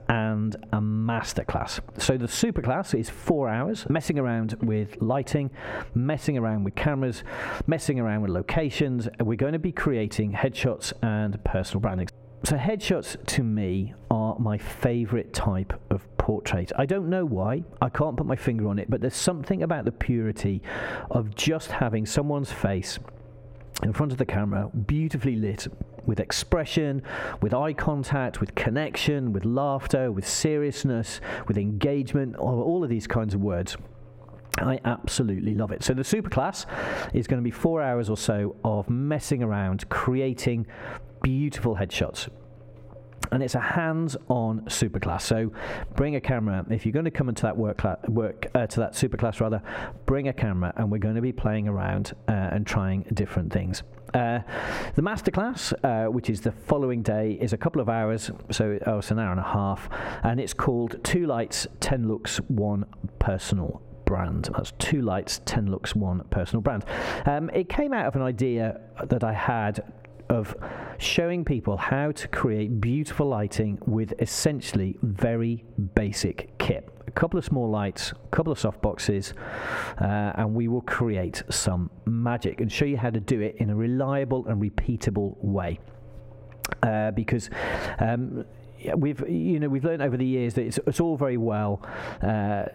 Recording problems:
squashed, flat; heavily
muffled; very slightly; fading above 2 kHz

